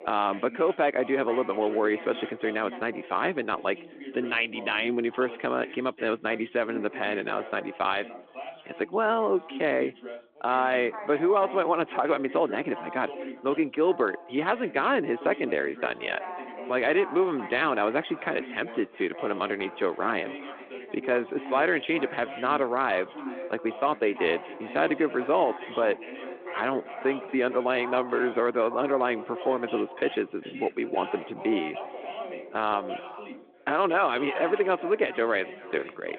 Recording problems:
echo of what is said; faint; from 18 s on; 400 ms later, 20 dB below the speech
phone-call audio
background chatter; noticeable; throughout; 3 voices, 15 dB below the speech

